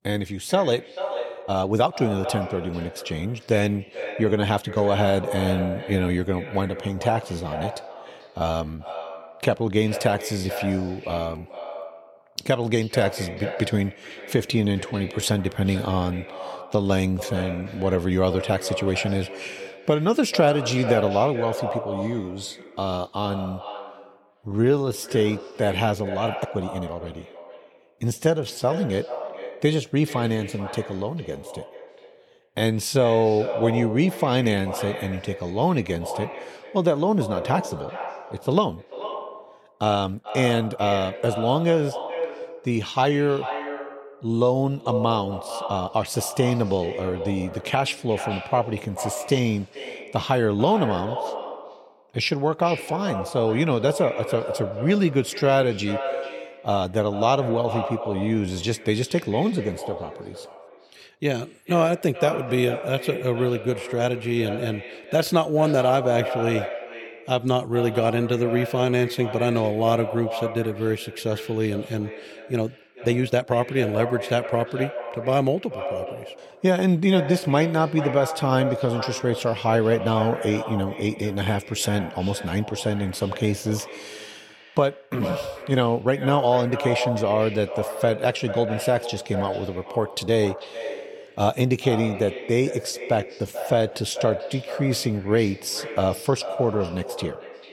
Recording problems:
echo of what is said; strong; throughout; 440 ms later, 9 dB below the speech
uneven, jittery; strongly; from 1.5 s to 1:34

